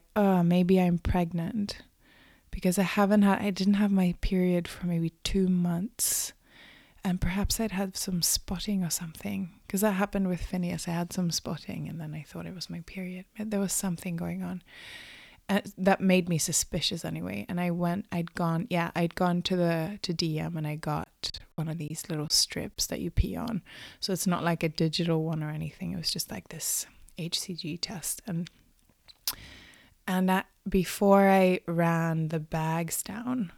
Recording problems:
choppy; very; from 21 to 22 s; 6% of the speech affected

